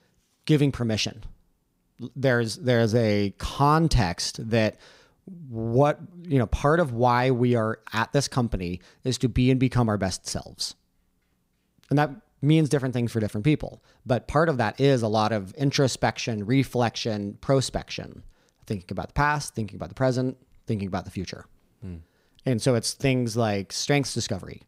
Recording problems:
none

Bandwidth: 15.5 kHz